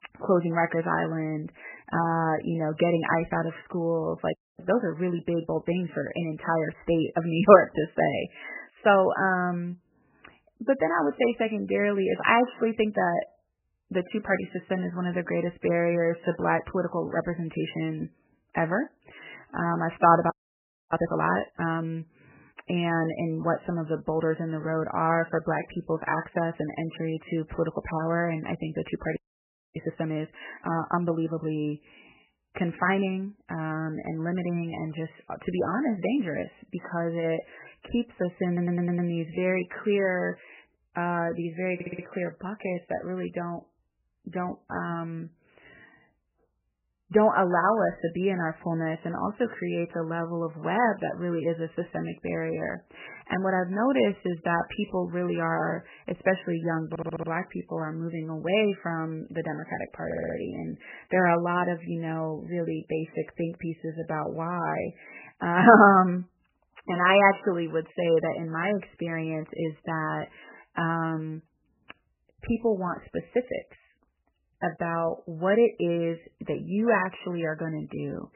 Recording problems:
garbled, watery; badly; nothing above 3 kHz
audio freezing; at 4.5 s, at 20 s for 0.5 s and at 29 s for 0.5 s
audio stuttering; 4 times, first at 38 s

